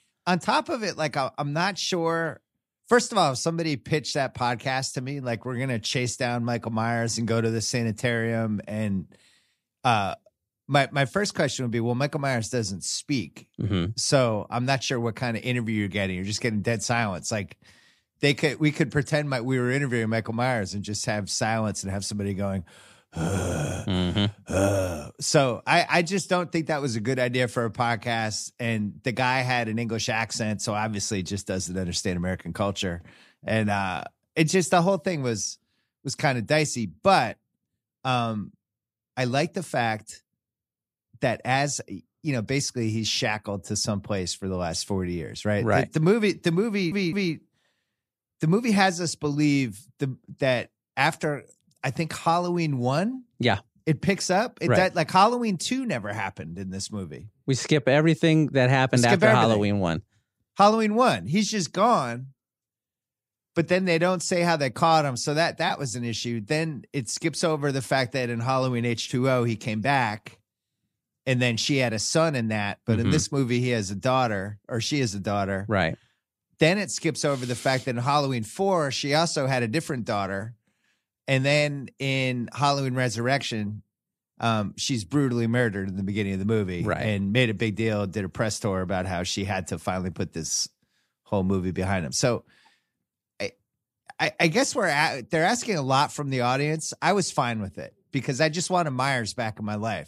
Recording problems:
audio stuttering; at 47 s

